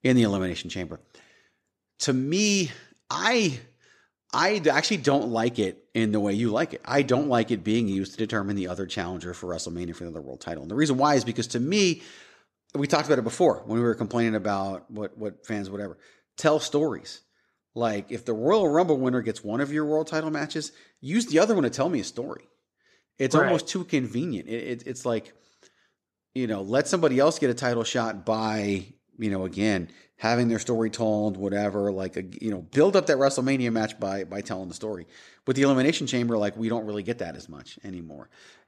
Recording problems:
none

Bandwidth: 14 kHz